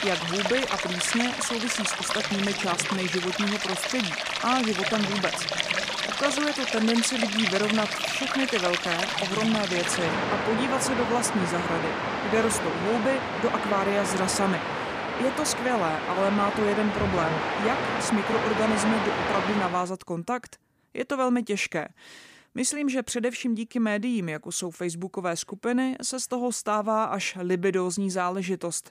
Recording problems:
rain or running water; very loud; until 20 s; as loud as the speech

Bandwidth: 15 kHz